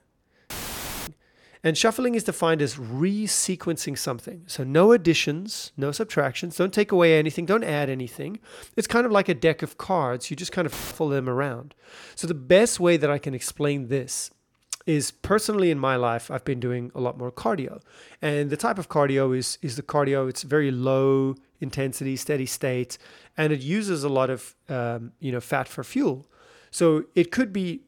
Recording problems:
audio cutting out; filled with static; at 0.5 s for 0.5 s and at 11 s

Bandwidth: 17.5 kHz